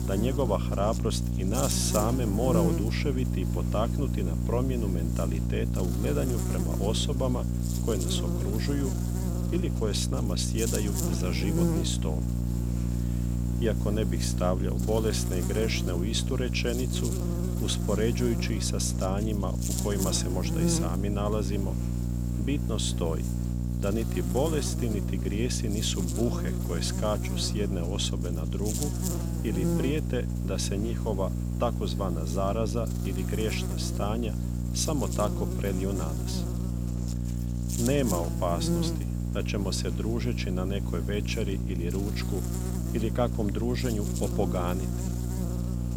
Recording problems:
electrical hum; loud; throughout; 60 Hz, 5 dB below the speech

